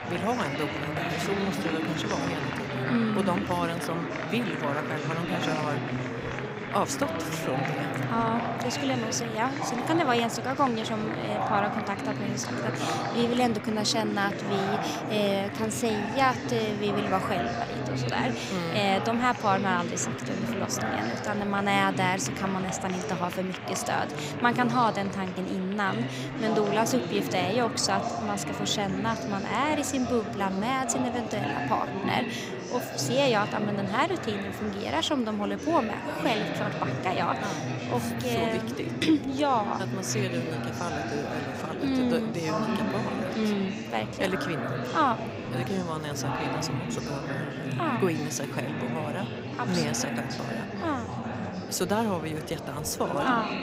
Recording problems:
murmuring crowd; loud; throughout; 3 dB below the speech

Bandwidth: 15.5 kHz